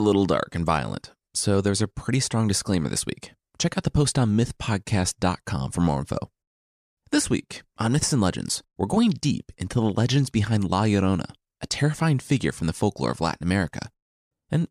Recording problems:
abrupt cut into speech; at the start

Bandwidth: 14.5 kHz